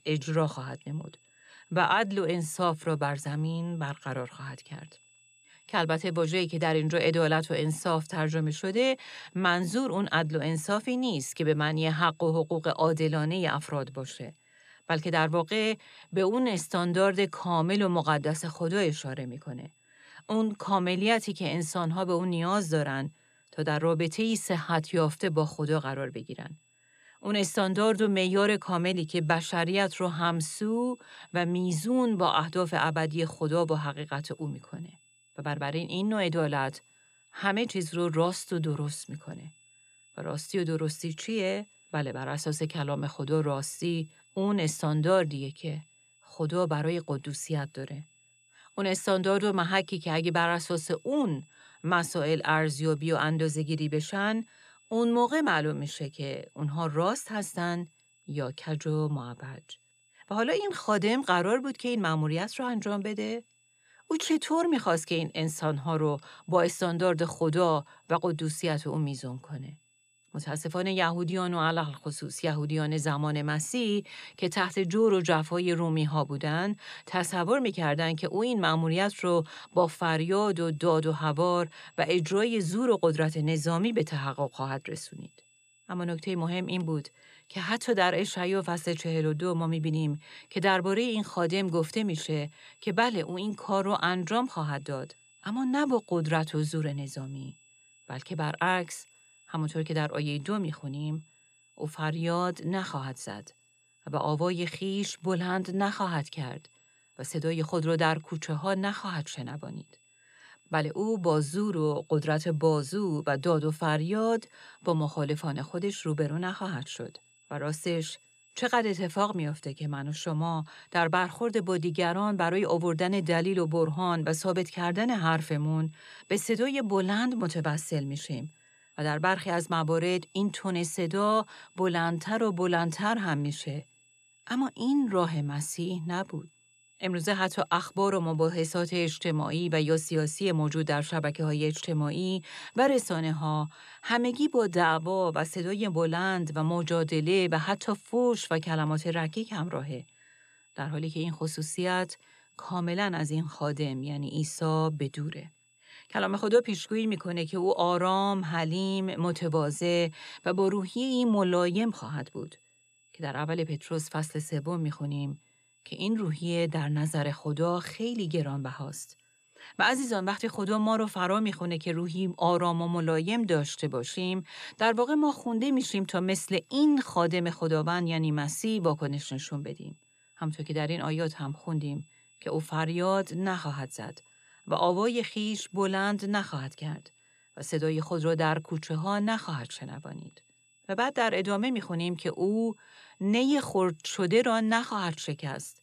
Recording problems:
high-pitched whine; faint; throughout; 2.5 kHz, 30 dB below the speech

